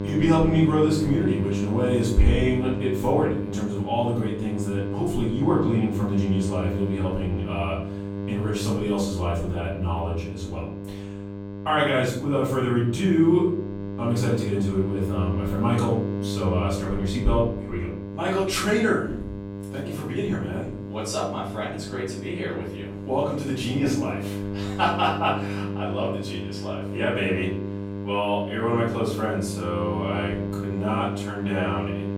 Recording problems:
off-mic speech; far
room echo; noticeable; dies away in 0.6 s
electrical hum; loud; throughout; 50 Hz, 9 dB below the speech

